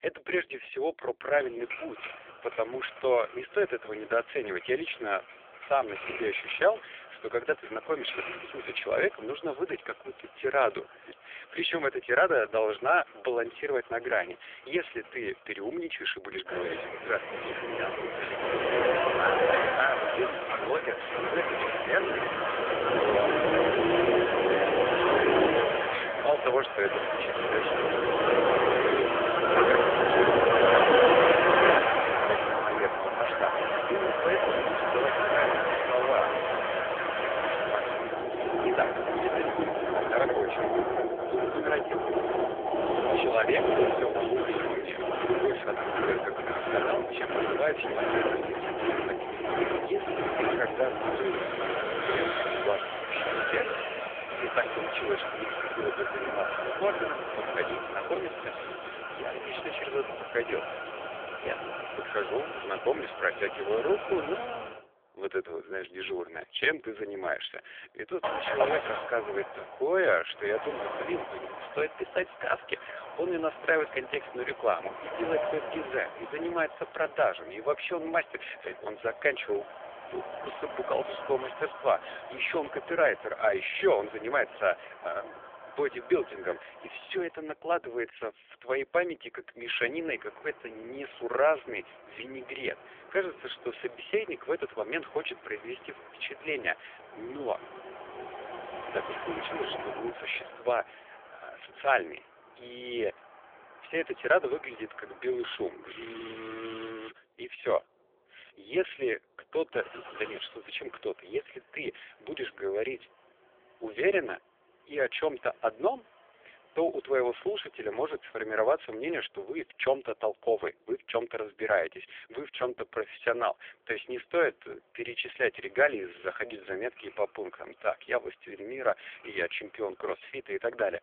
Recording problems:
phone-call audio; poor line; nothing above 3.5 kHz
traffic noise; very loud; throughout; 3 dB above the speech

